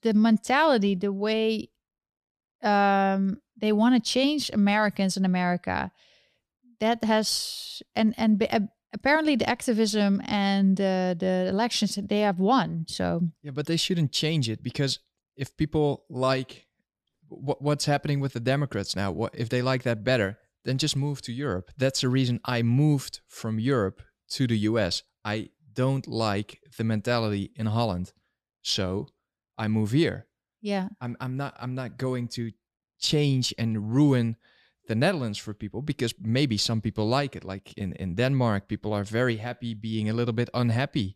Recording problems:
none

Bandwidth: 13.5 kHz